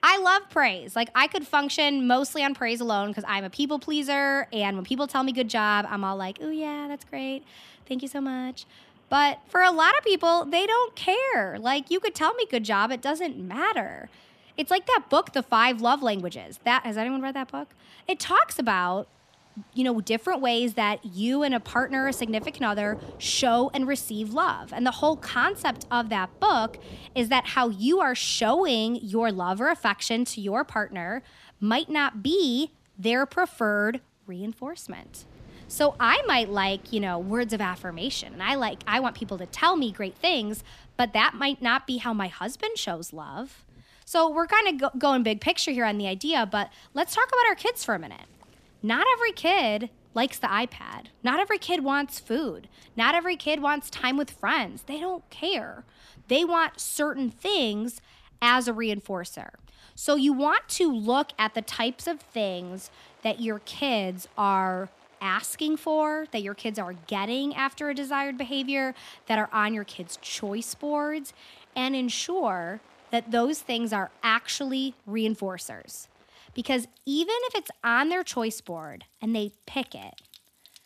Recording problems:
rain or running water; faint; throughout; 30 dB below the speech

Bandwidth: 14.5 kHz